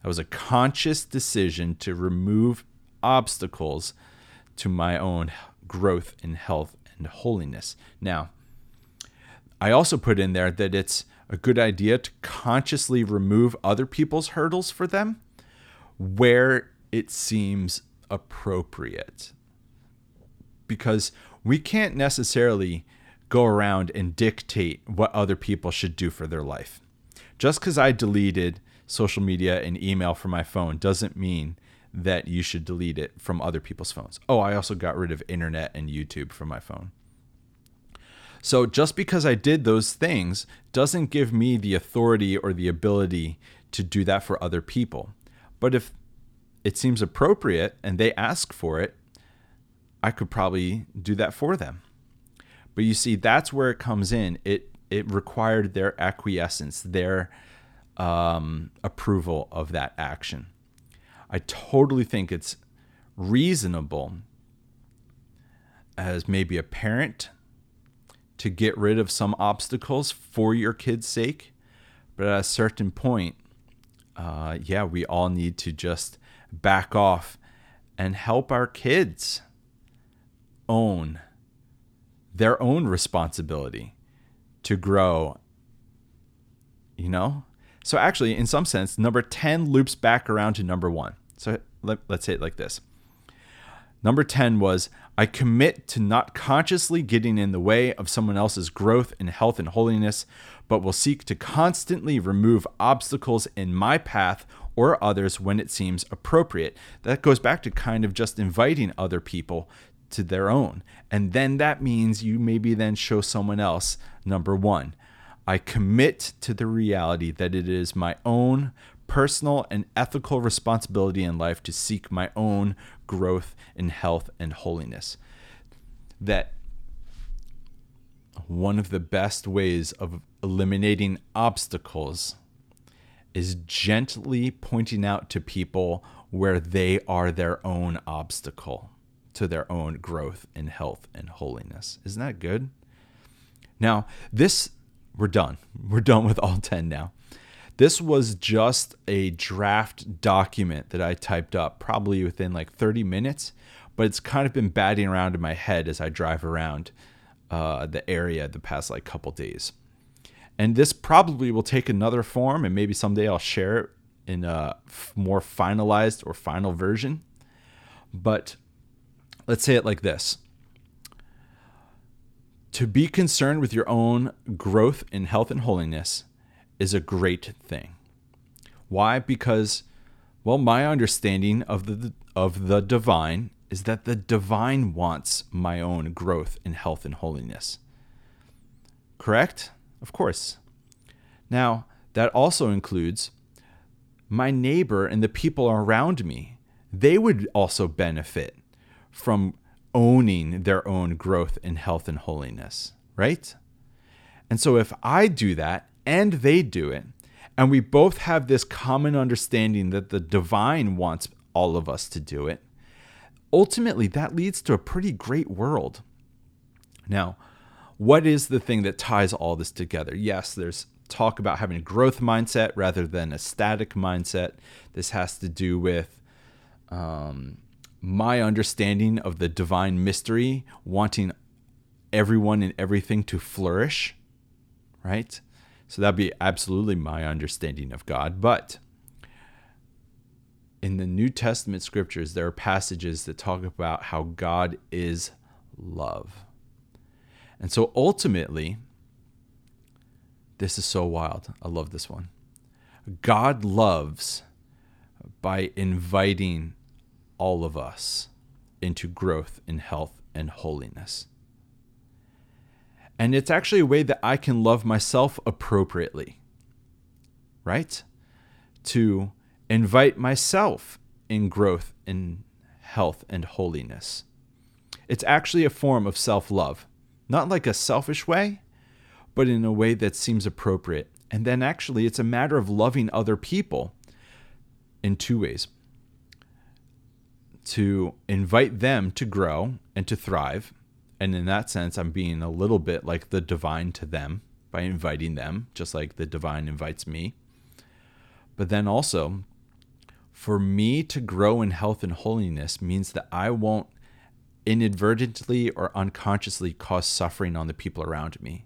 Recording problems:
none

